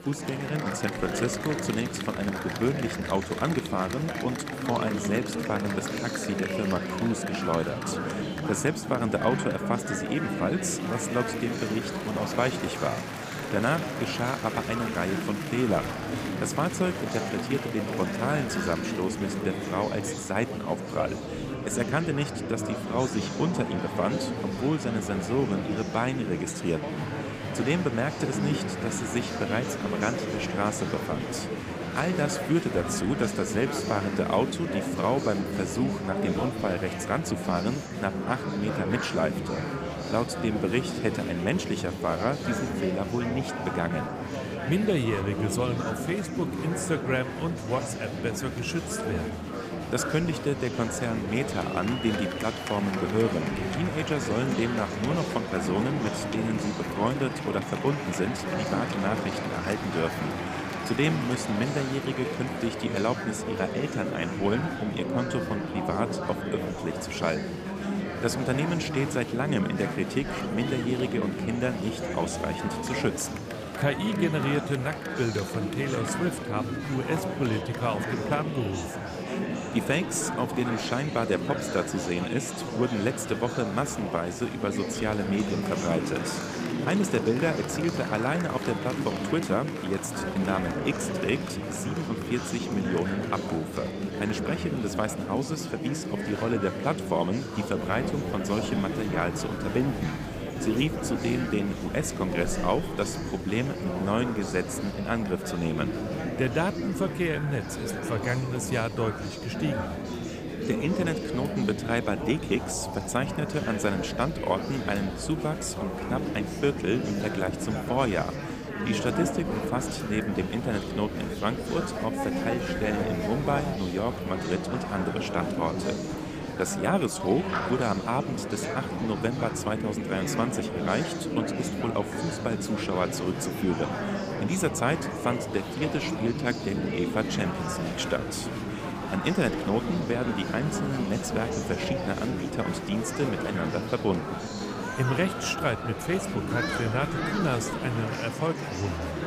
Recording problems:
murmuring crowd; loud; throughout; 2 dB below the speech

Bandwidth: 15 kHz